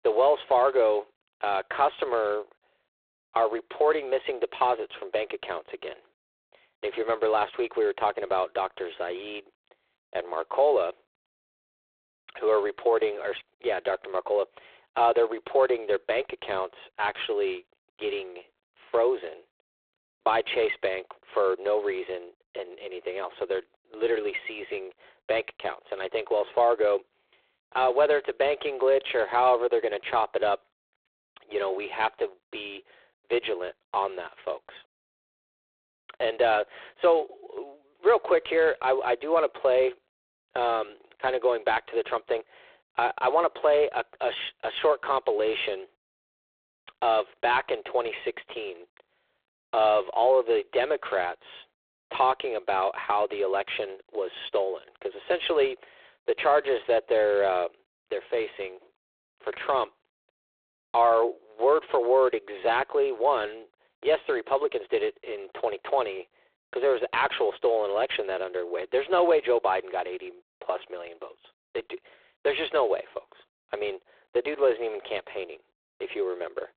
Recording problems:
phone-call audio; poor line

